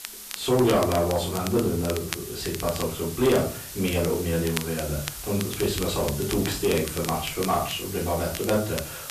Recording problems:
off-mic speech; far
room echo; noticeable; dies away in 0.3 s
distortion; slight; 10 dB below the speech
hiss; loud; throughout; 10 dB below the speech
crackle, like an old record; noticeable; 10 dB below the speech

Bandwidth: 14.5 kHz